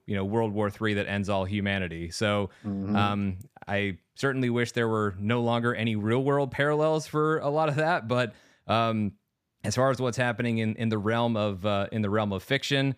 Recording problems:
none

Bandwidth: 15 kHz